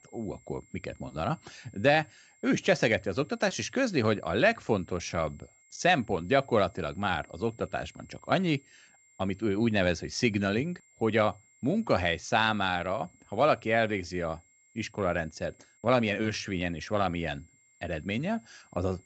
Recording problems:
high-pitched whine; faint; throughout; 2 kHz, 30 dB below the speech

